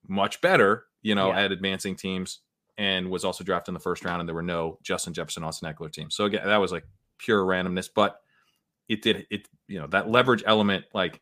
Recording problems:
none

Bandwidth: 15 kHz